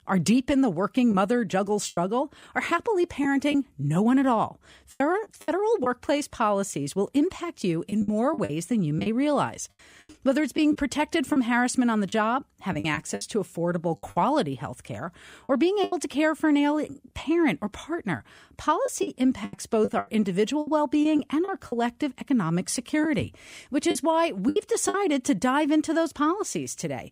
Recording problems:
choppy; very; 7% of the speech affected

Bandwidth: 15.5 kHz